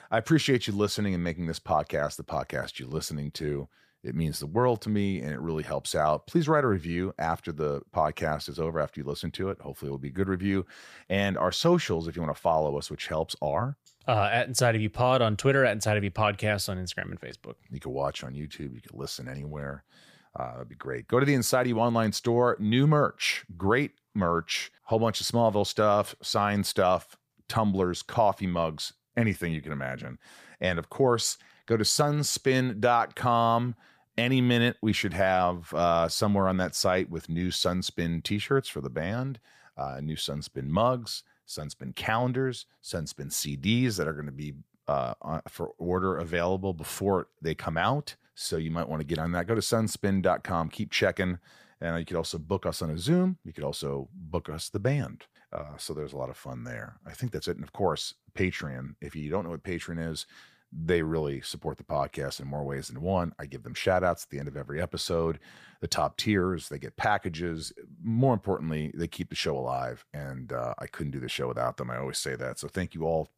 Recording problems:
none

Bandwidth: 15 kHz